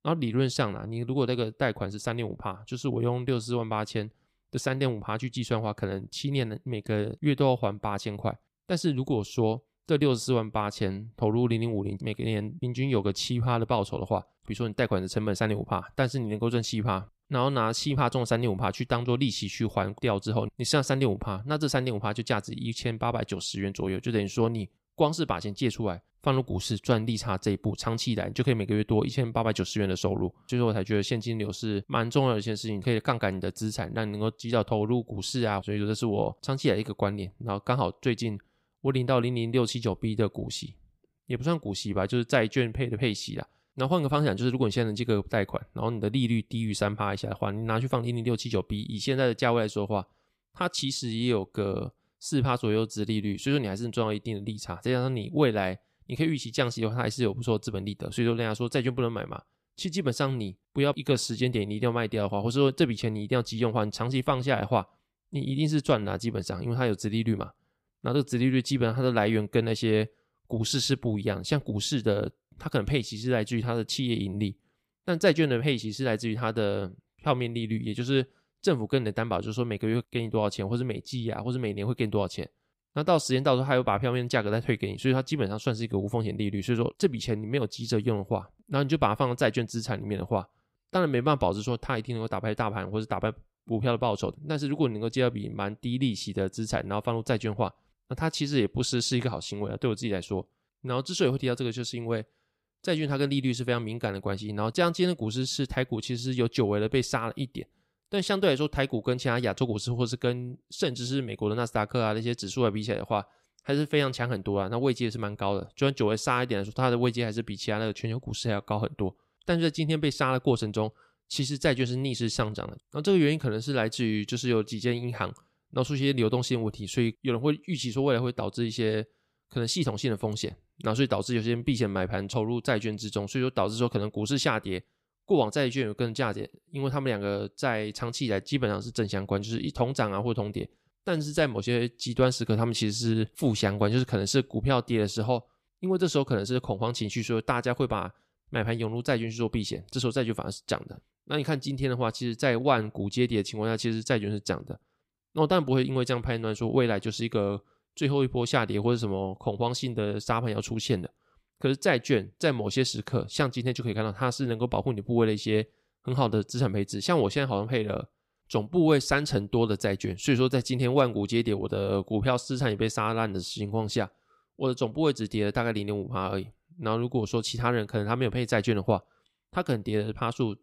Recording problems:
none

